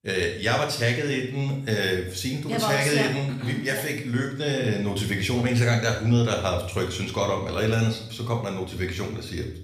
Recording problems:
room echo; slight; dies away in 0.6 s
off-mic speech; somewhat distant

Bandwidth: 14.5 kHz